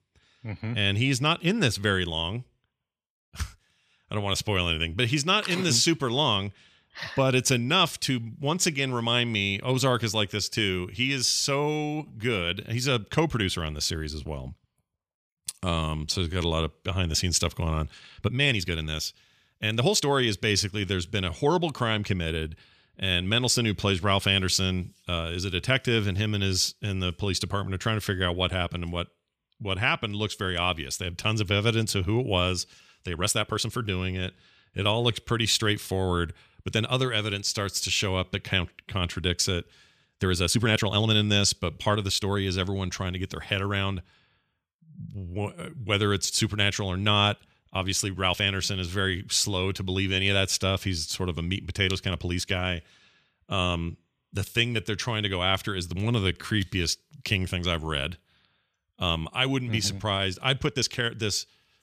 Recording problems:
uneven, jittery; strongly; from 12 s to 1:01

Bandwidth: 14.5 kHz